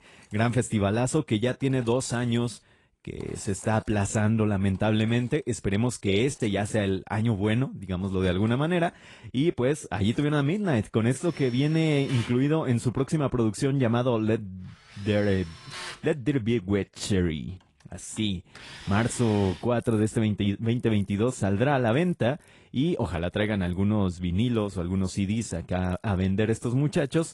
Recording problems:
garbled, watery; slightly; nothing above 10 kHz
machinery noise; noticeable; throughout; 20 dB below the speech

